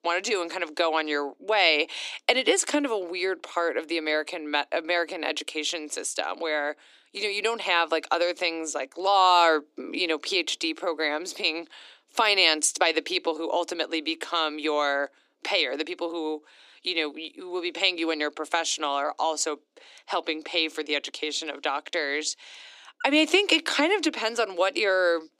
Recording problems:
thin; somewhat; fading below 300 Hz

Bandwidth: 15 kHz